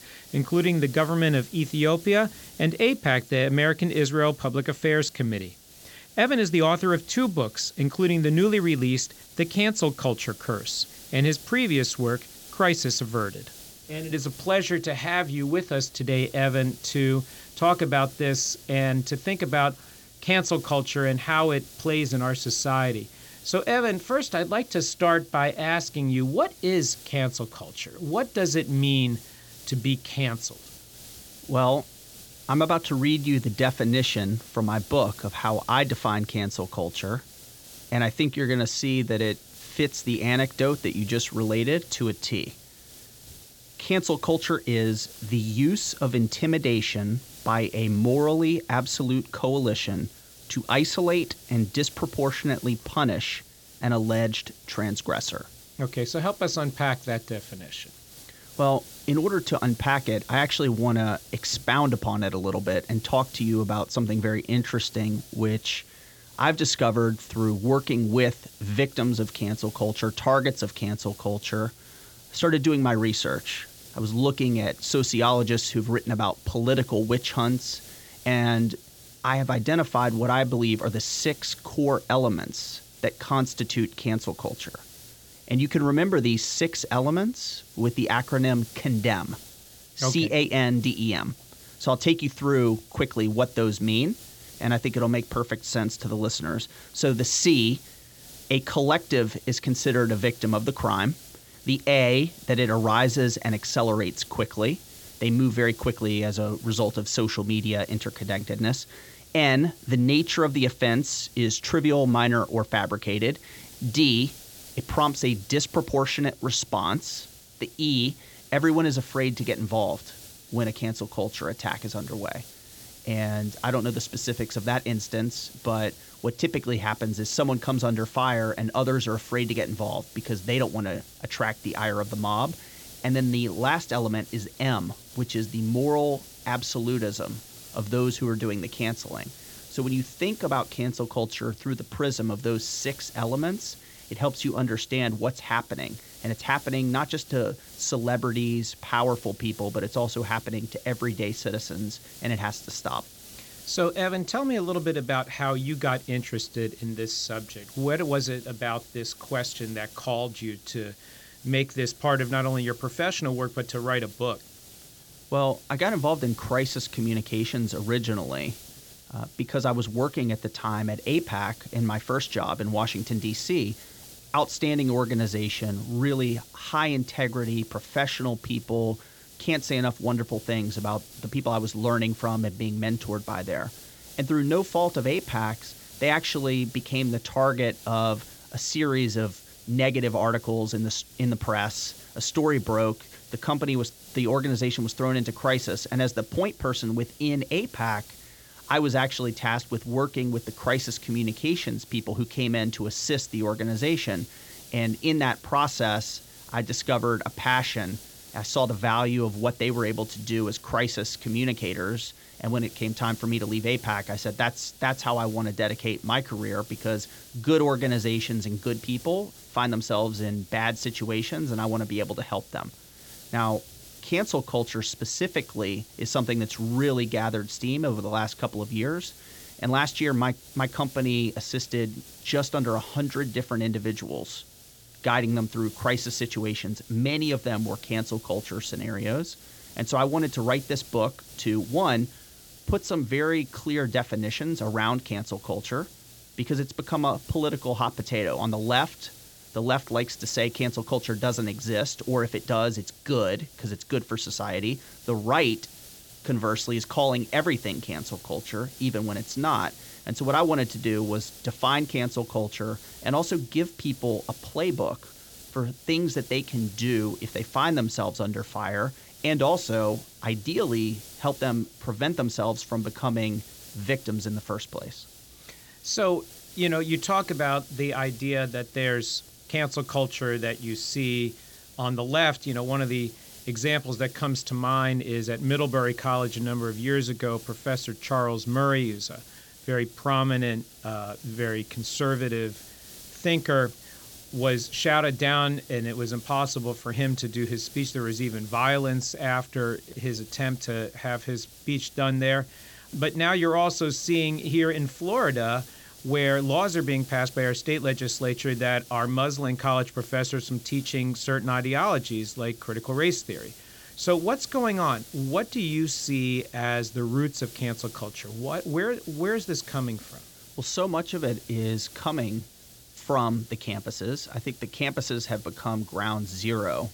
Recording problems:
high frequencies cut off; noticeable; nothing above 7.5 kHz
hiss; noticeable; throughout; 20 dB below the speech

